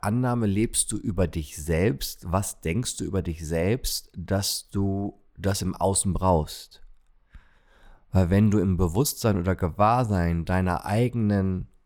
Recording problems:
none

